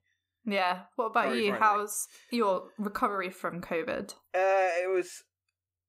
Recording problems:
none

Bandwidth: 15.5 kHz